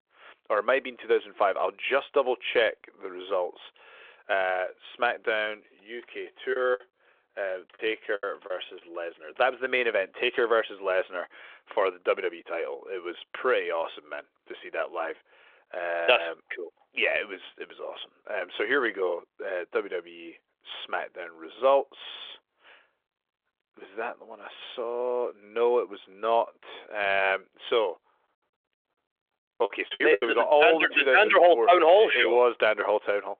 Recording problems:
phone-call audio; nothing above 3.5 kHz
choppy; very; from 6.5 to 9 s and at 30 s; 20% of the speech affected

